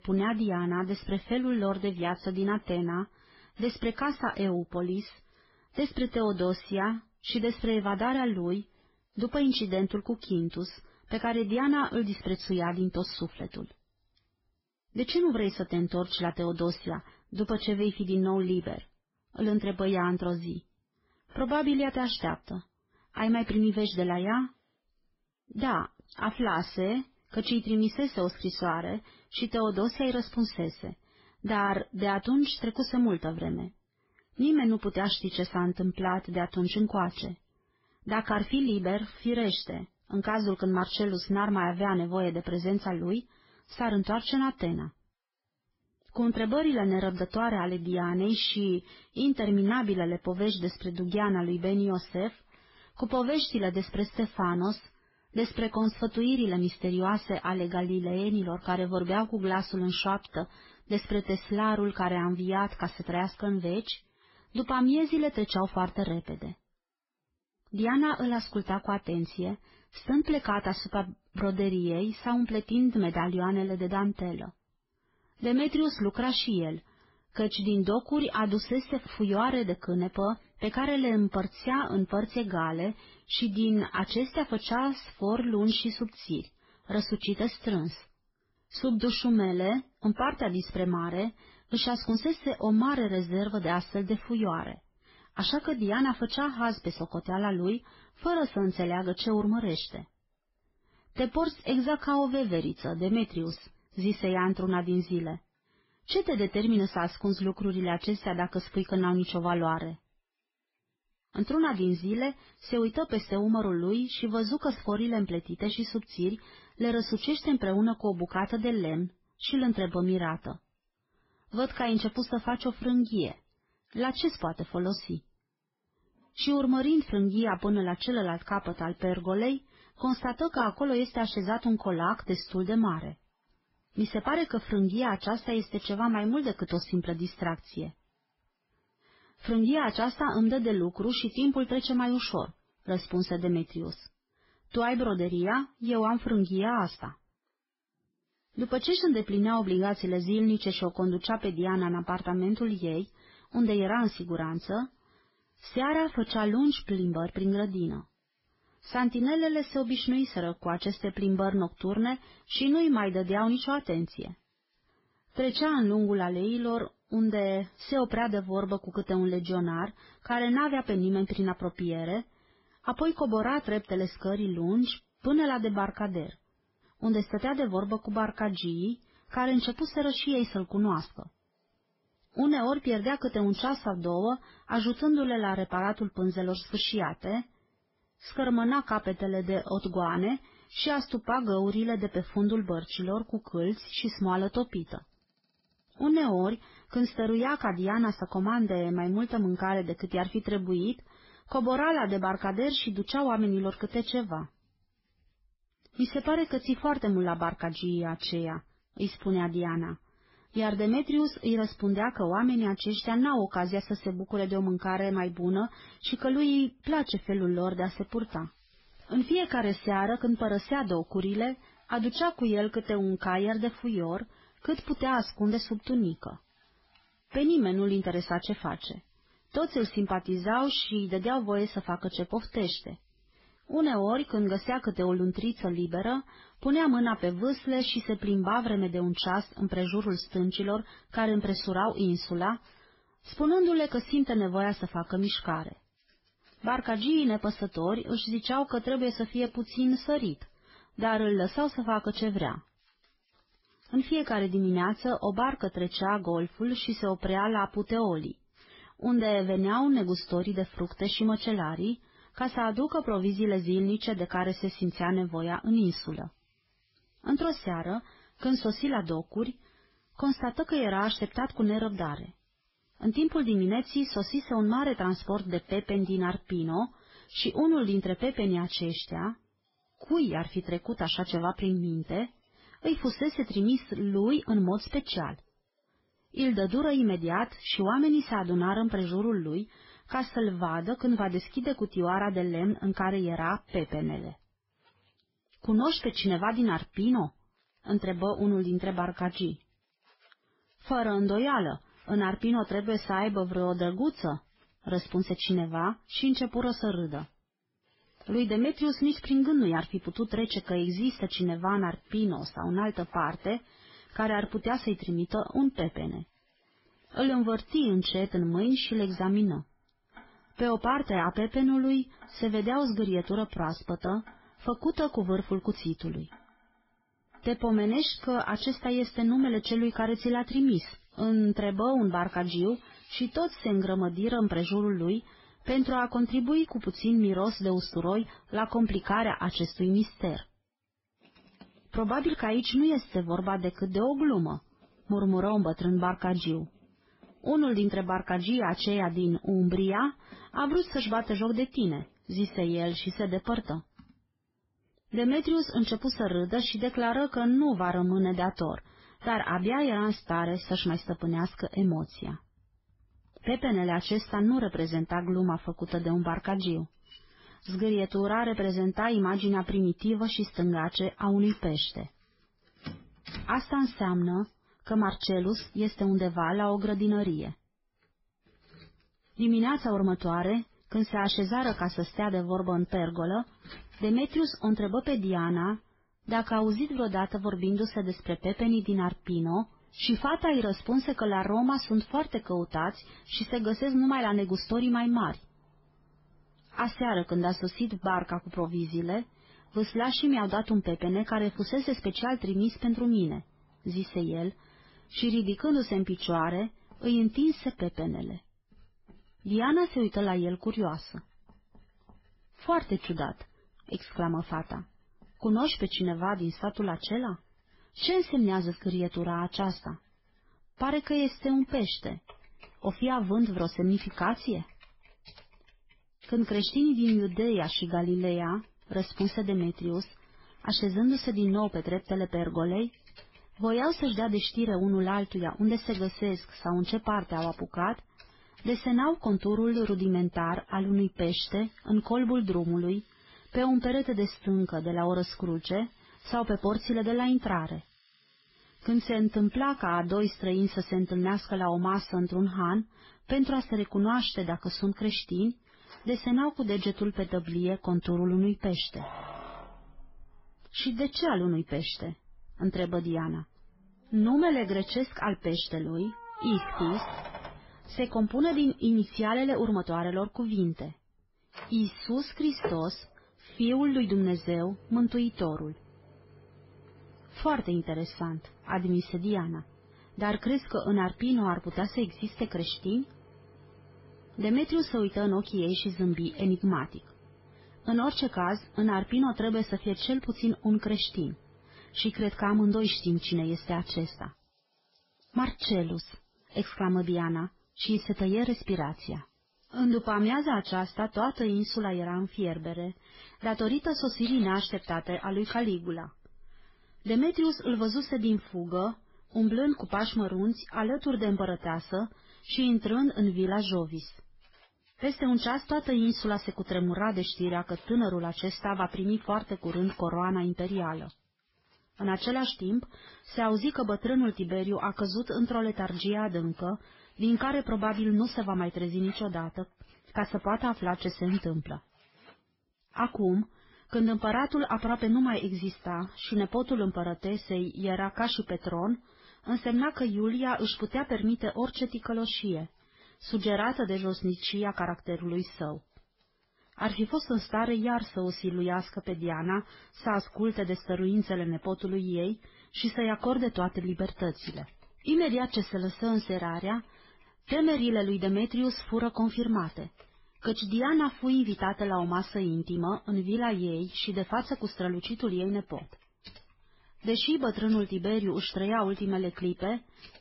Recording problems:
garbled, watery; badly; nothing above 5.5 kHz
household noises; faint; throughout; 25 dB below the speech

